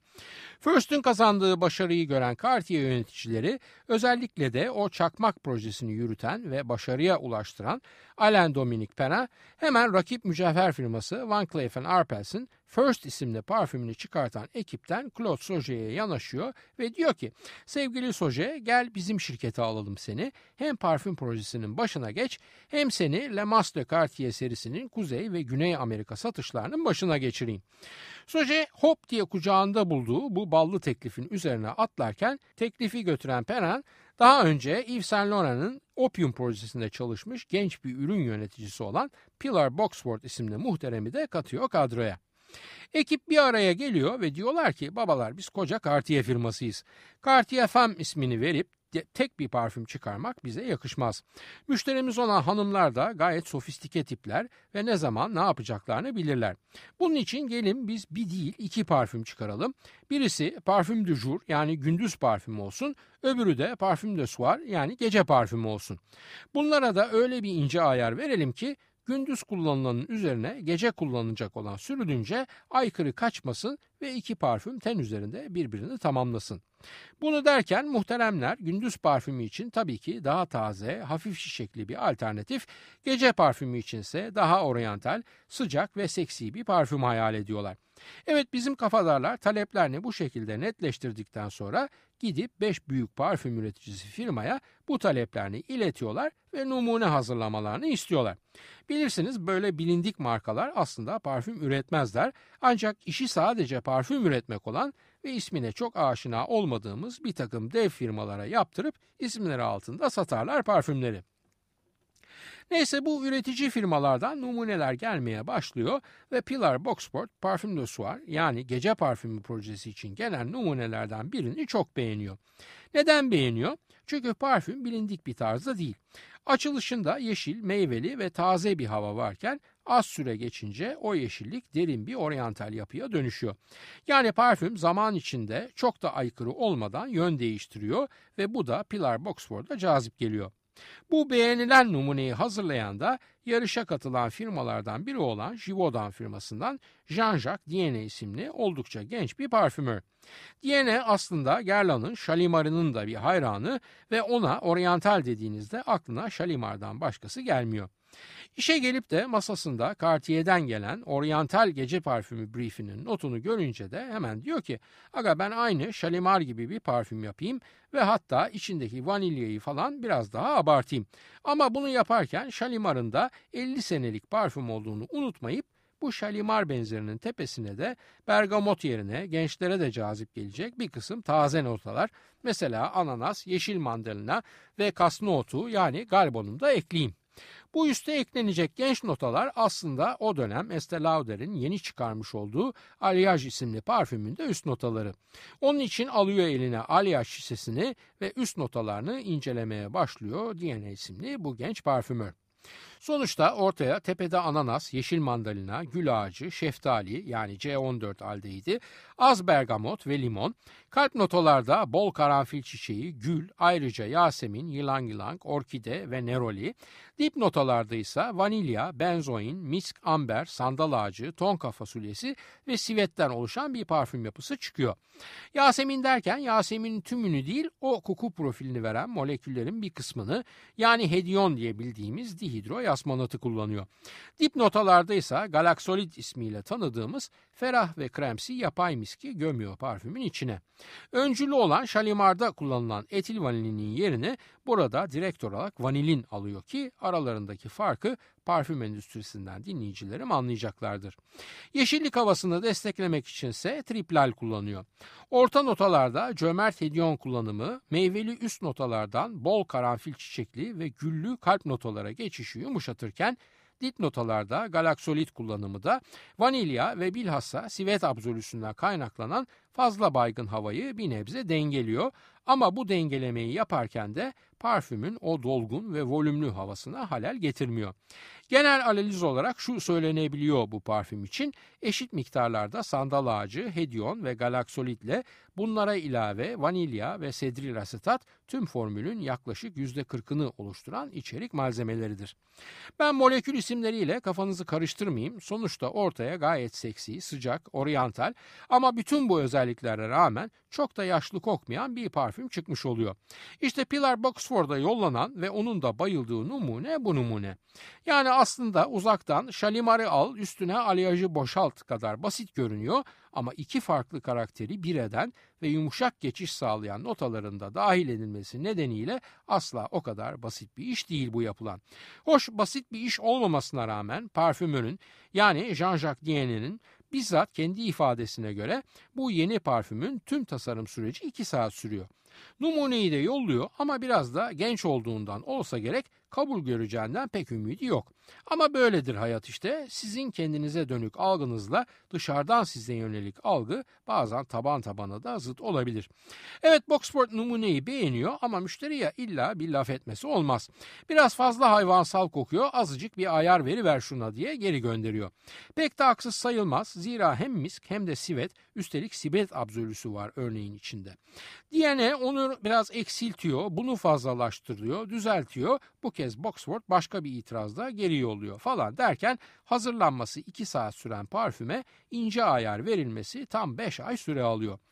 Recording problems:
none

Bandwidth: 15 kHz